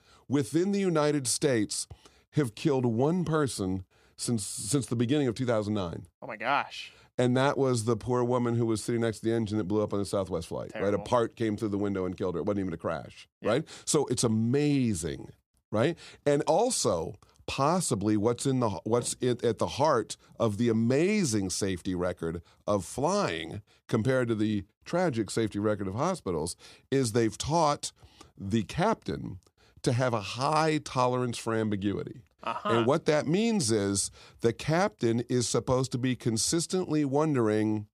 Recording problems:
none

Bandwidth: 14.5 kHz